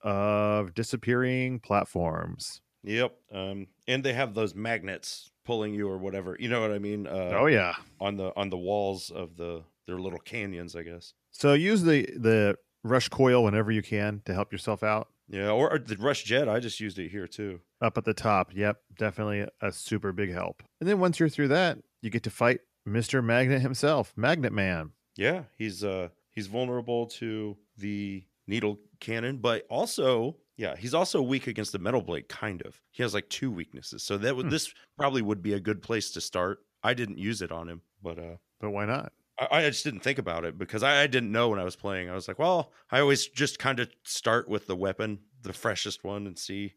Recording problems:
none

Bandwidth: 14.5 kHz